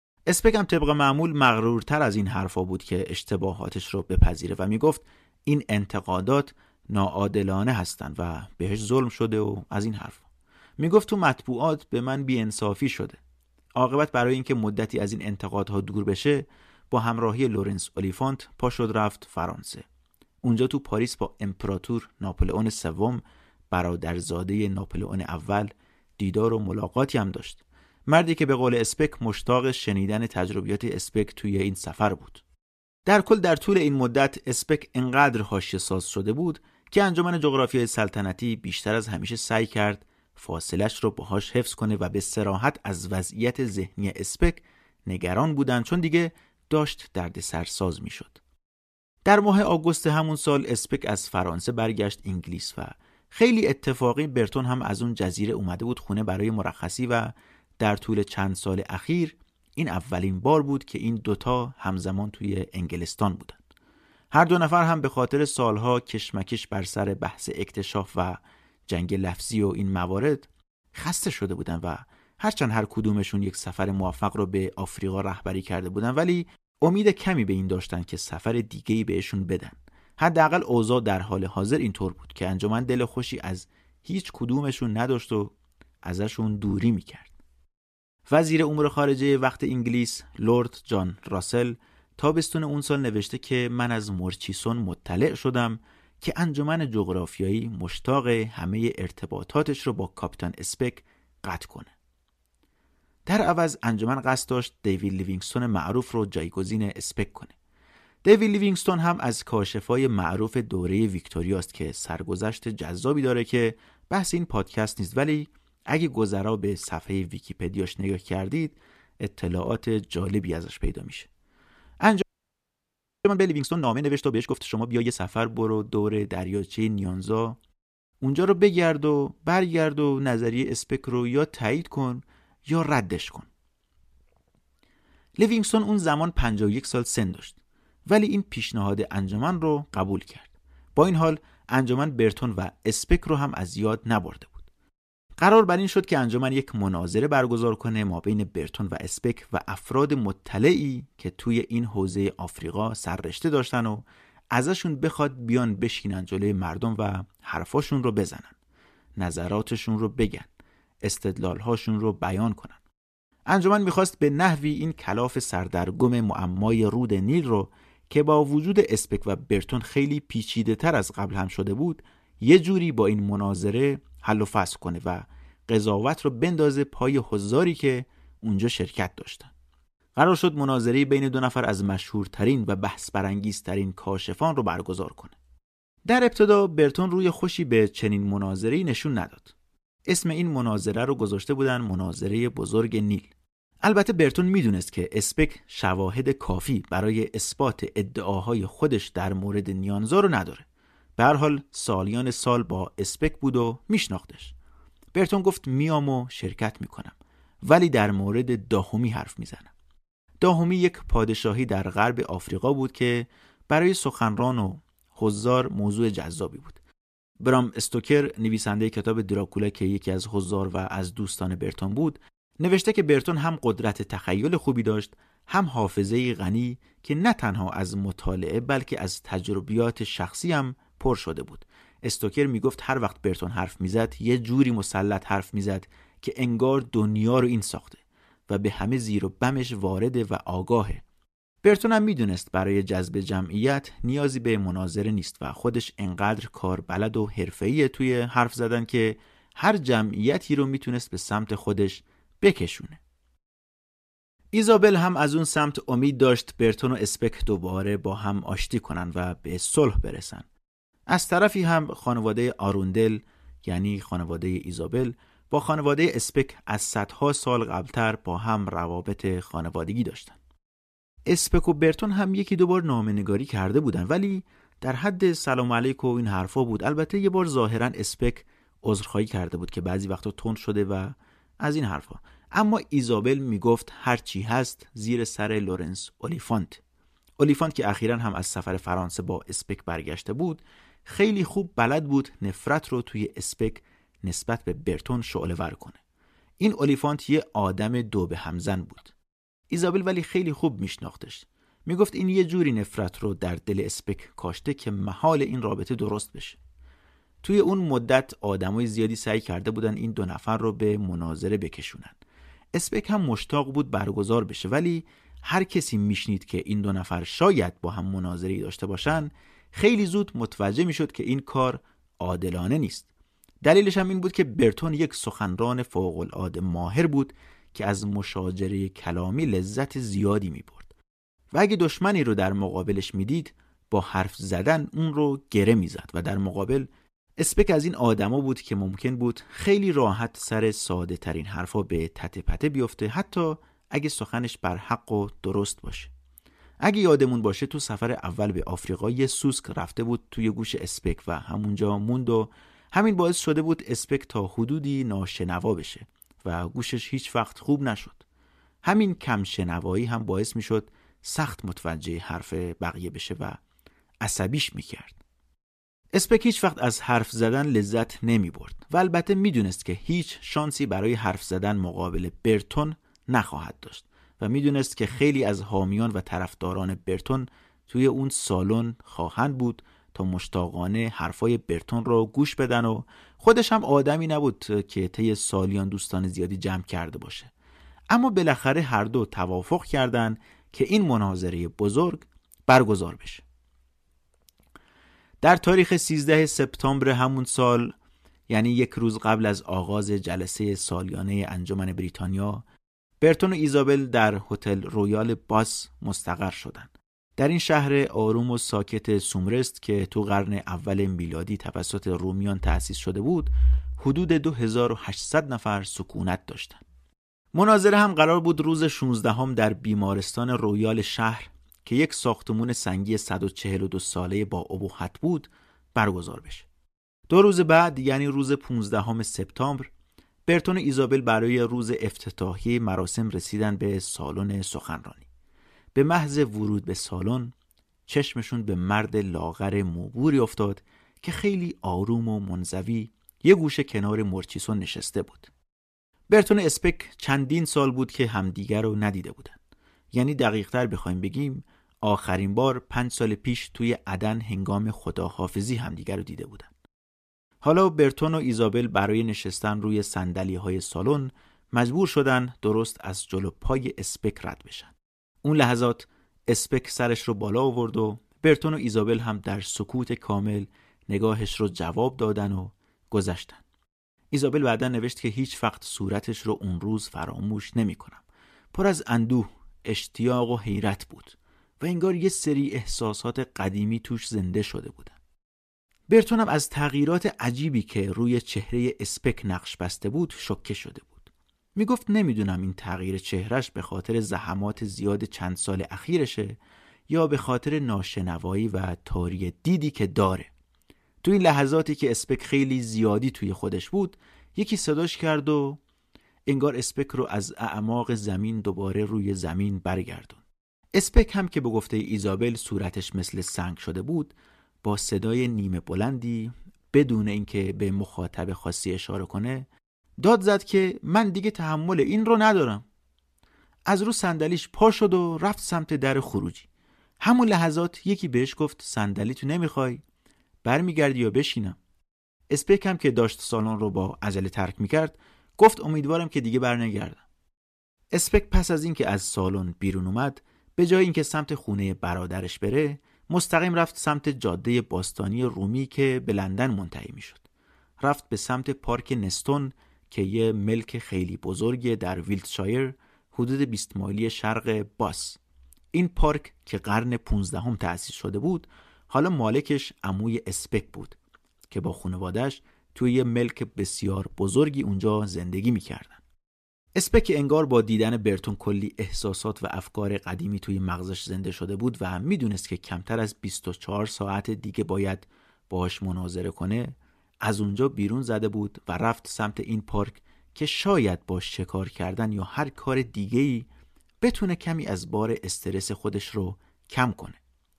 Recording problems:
audio freezing; at 2:02 for 1 s

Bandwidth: 14.5 kHz